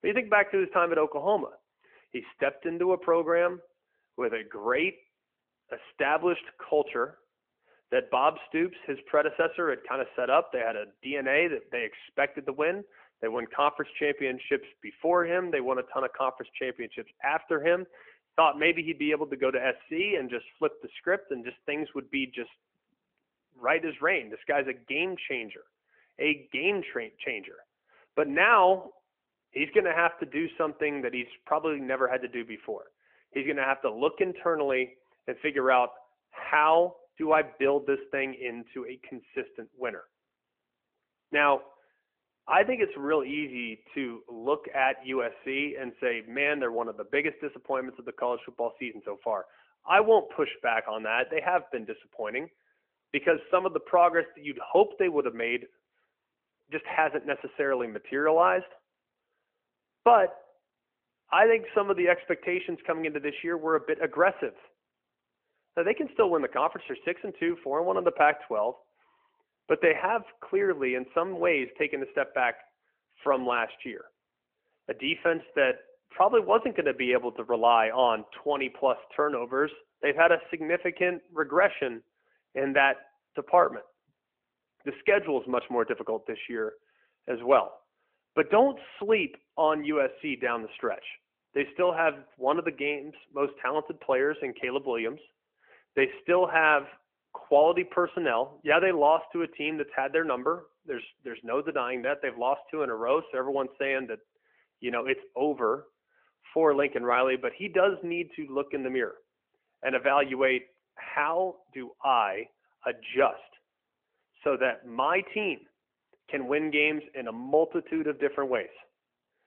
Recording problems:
phone-call audio

